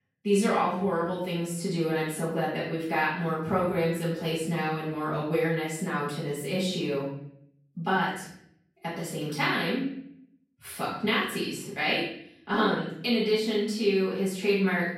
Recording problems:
off-mic speech; far
room echo; noticeable; dies away in 0.6 s

